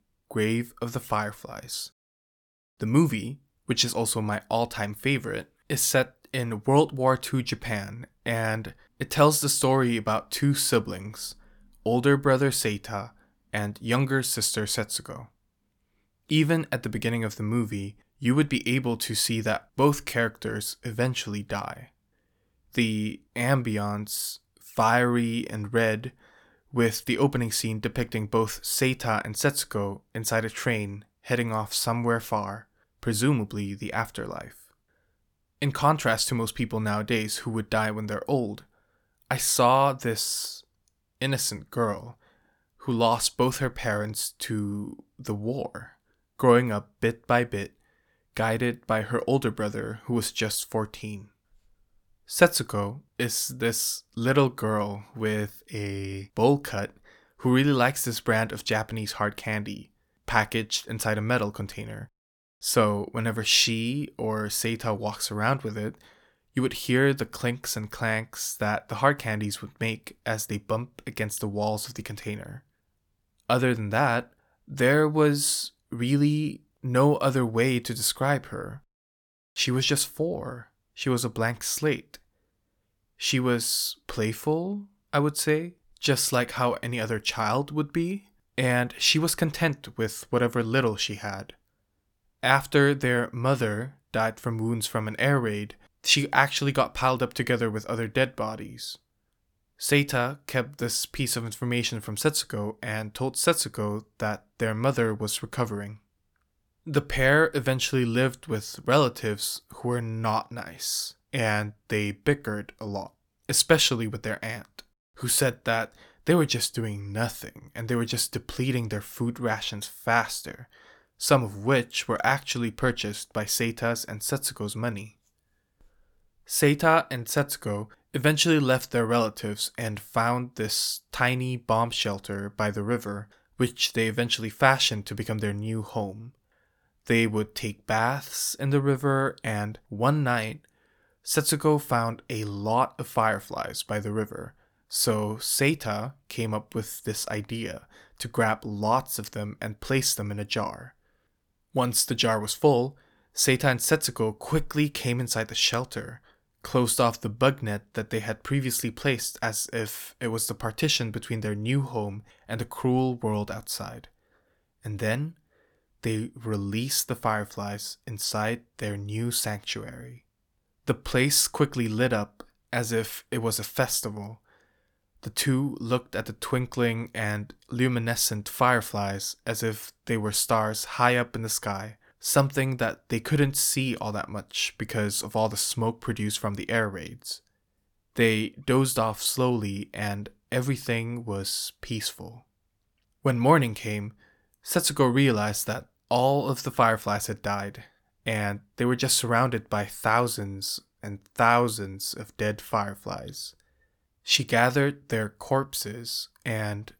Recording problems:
none

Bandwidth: 18.5 kHz